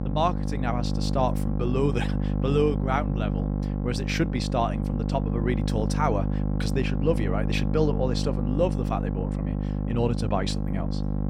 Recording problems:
electrical hum; loud; throughout; 50 Hz, 7 dB below the speech

